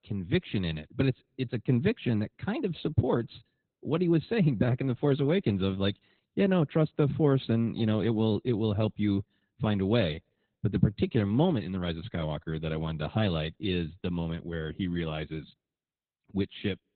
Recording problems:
garbled, watery; badly; nothing above 4 kHz

